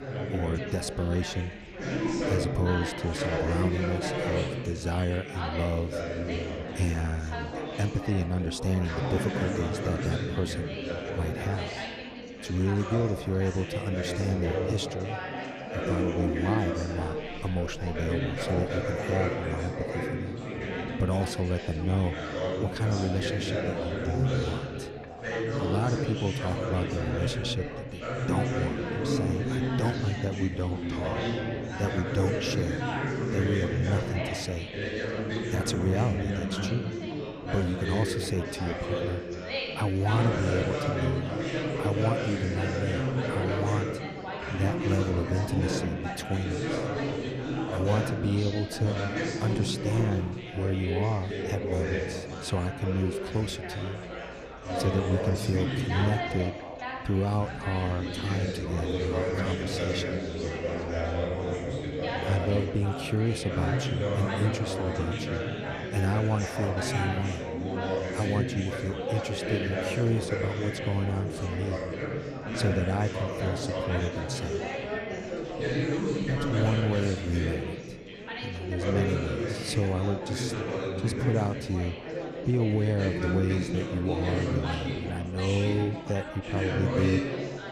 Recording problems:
chatter from many people; loud; throughout; 1 dB below the speech

